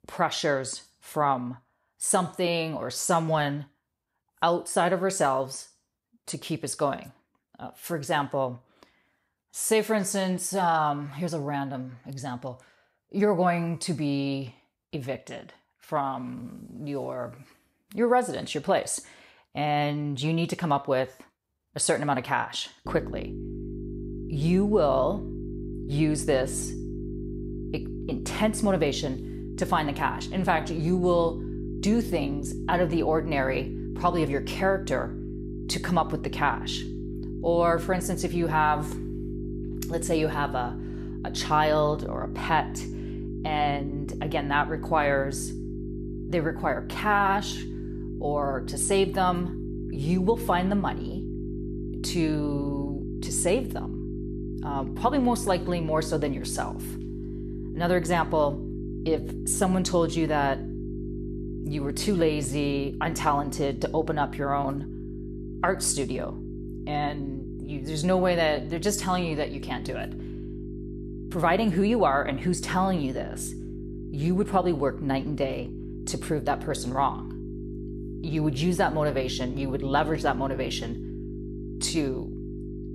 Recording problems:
electrical hum; noticeable; from 23 s on; 50 Hz, 15 dB below the speech

